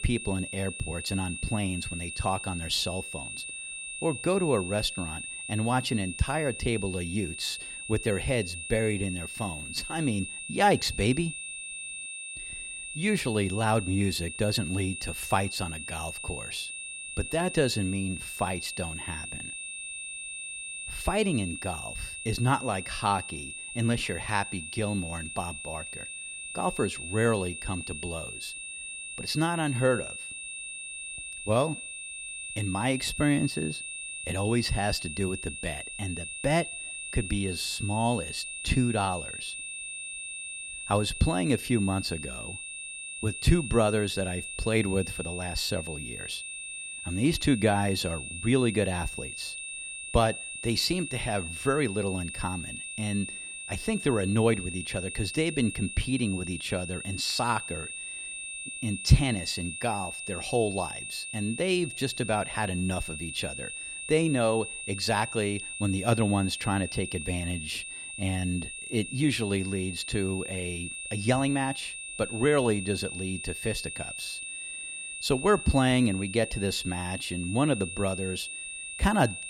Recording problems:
high-pitched whine; loud; throughout; 2.5 kHz, 7 dB below the speech

